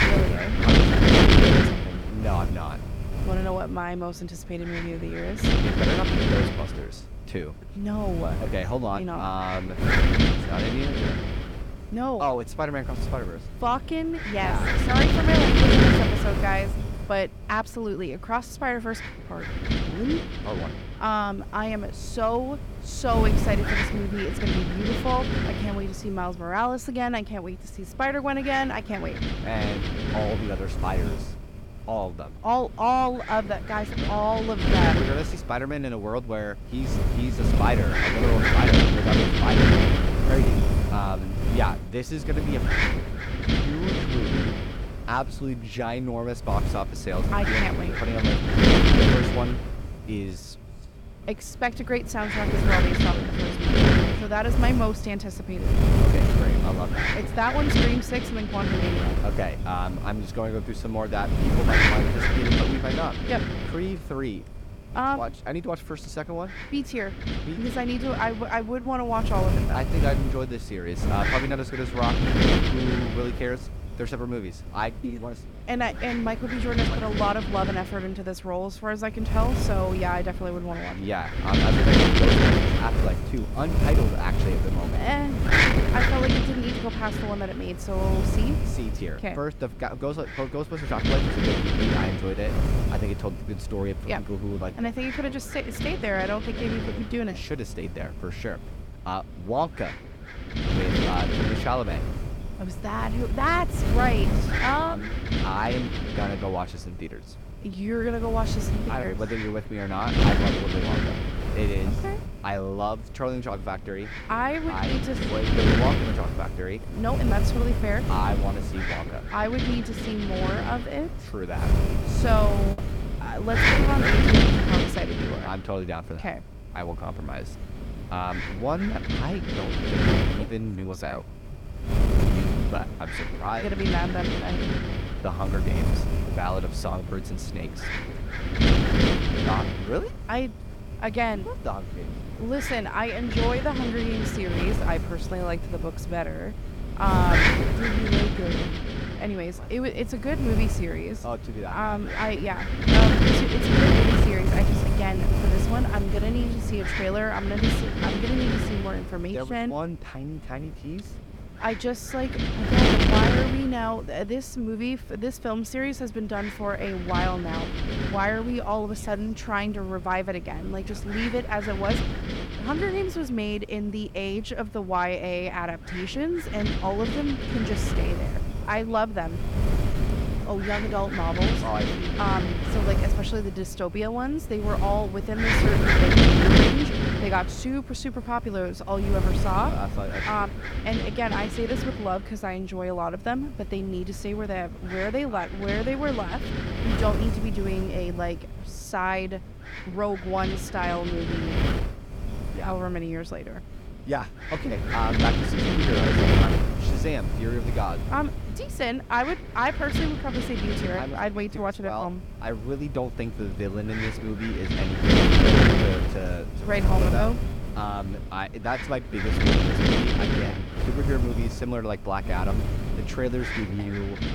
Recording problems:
wind noise on the microphone; heavy; 2 dB above the speech
choppy; occasionally; at 2:03; 2% of the speech affected

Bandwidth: 17 kHz